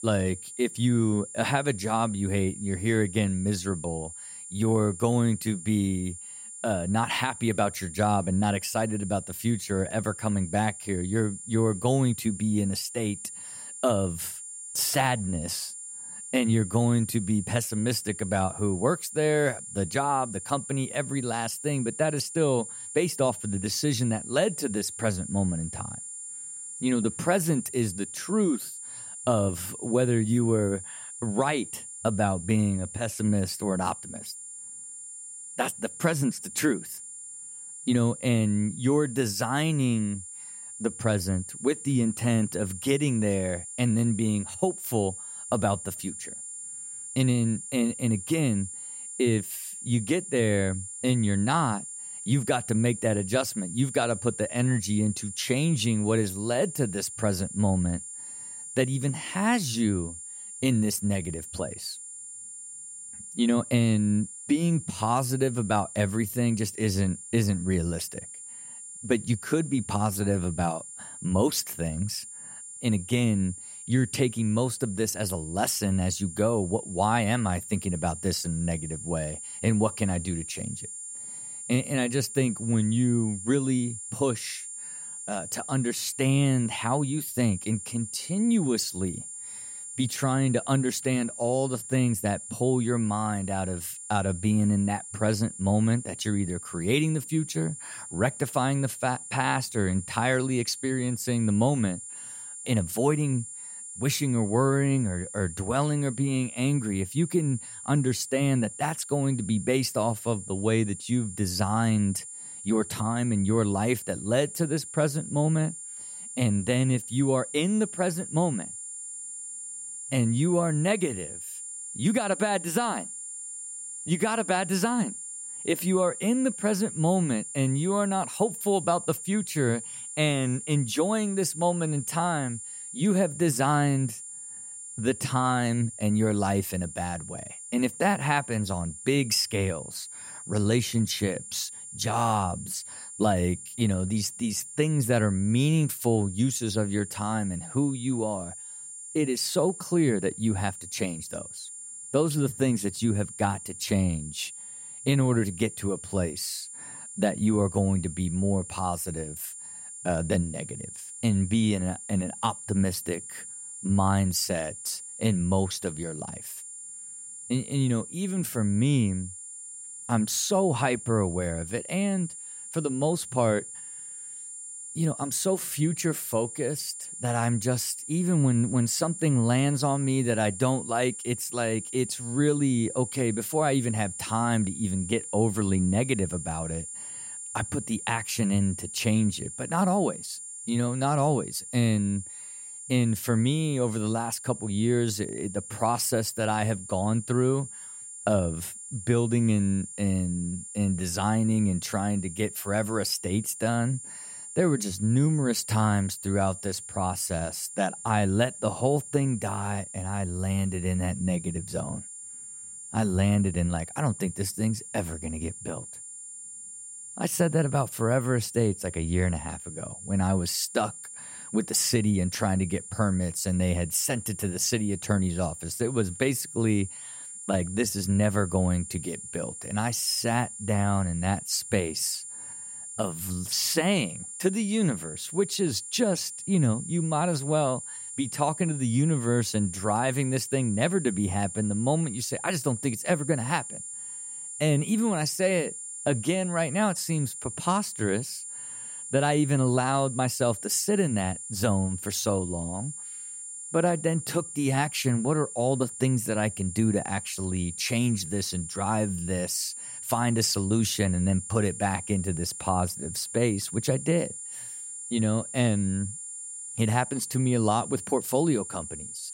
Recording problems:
high-pitched whine; loud; throughout; 9 kHz, 10 dB below the speech

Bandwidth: 16 kHz